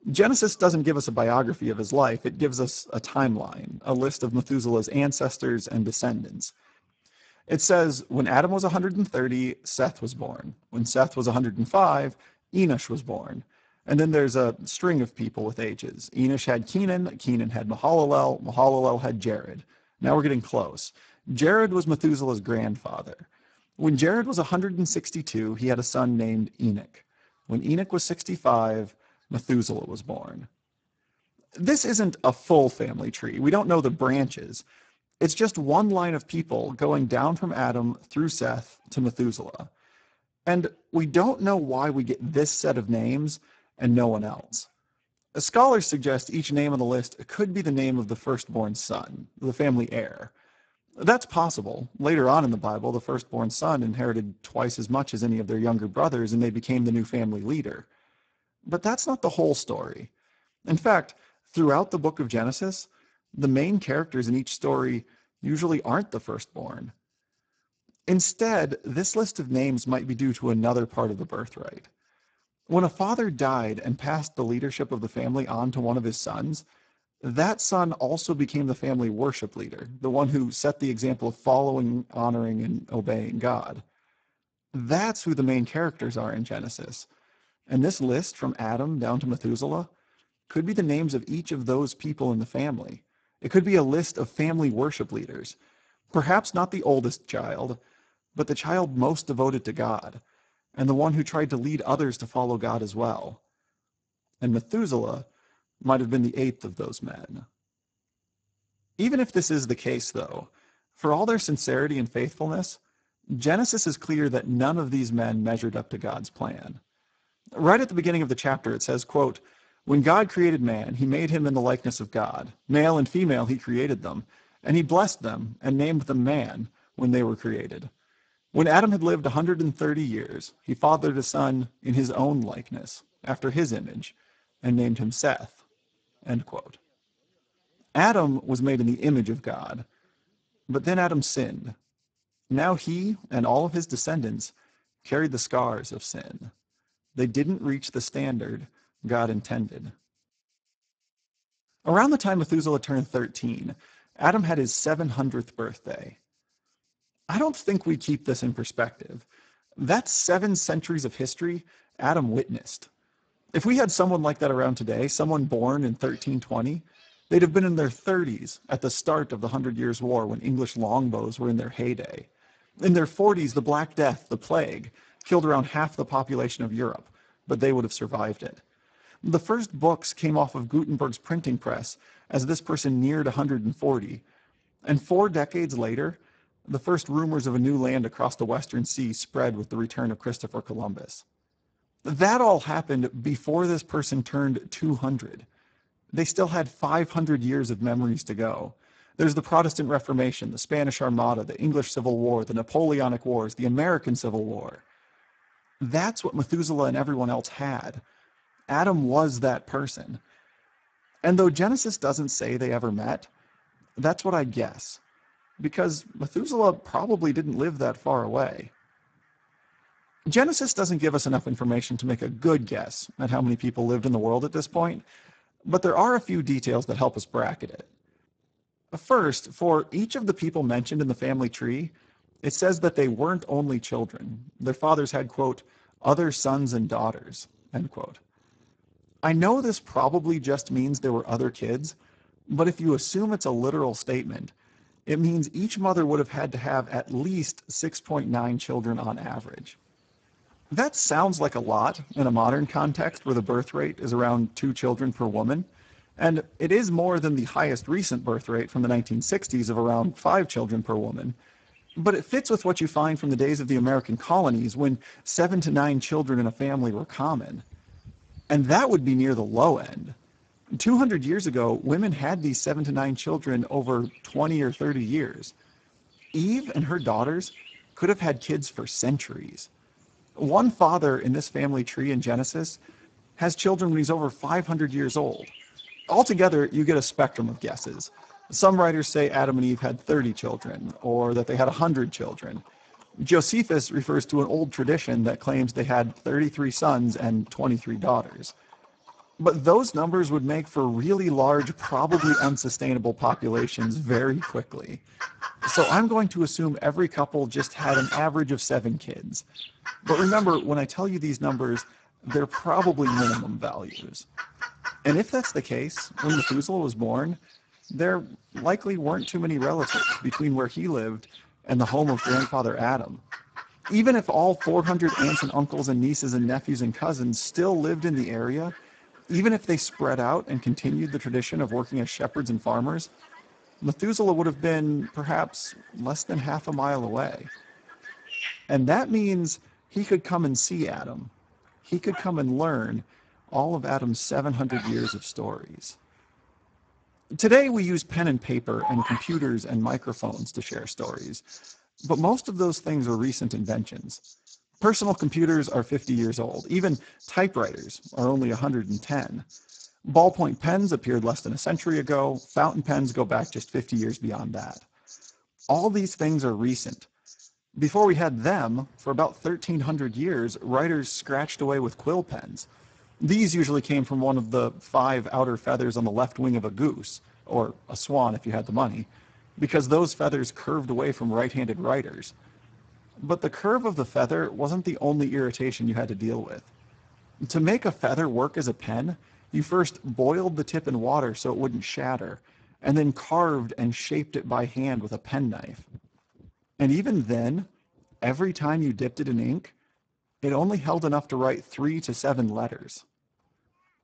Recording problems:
garbled, watery; badly; nothing above 7.5 kHz
animal sounds; noticeable; throughout; 10 dB below the speech

